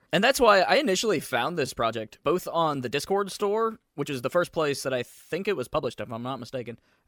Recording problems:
uneven, jittery; strongly; from 1 to 6 s

